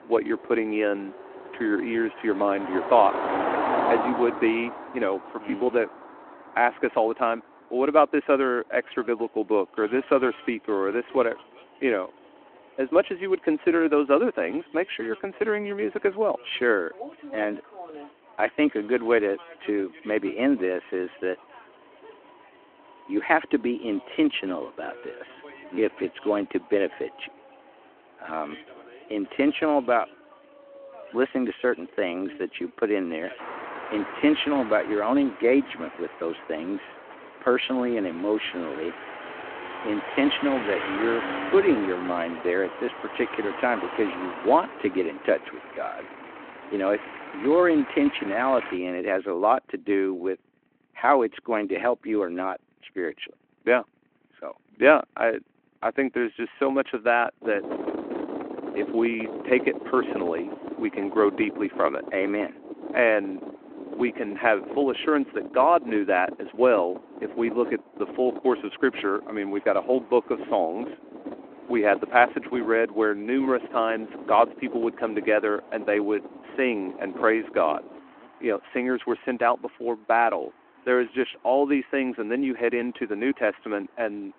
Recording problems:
phone-call audio
traffic noise; noticeable; throughout; 10 dB below the speech

